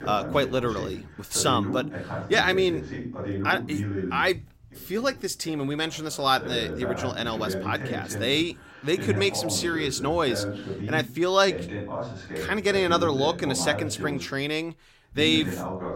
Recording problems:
voice in the background; loud; throughout; 7 dB below the speech

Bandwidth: 16 kHz